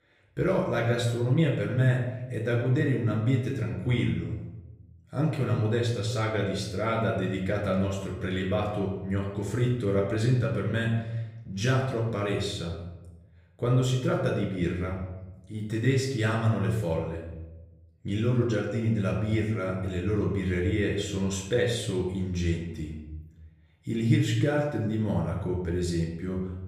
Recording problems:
off-mic speech; far
room echo; noticeable; dies away in 0.9 s

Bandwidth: 15.5 kHz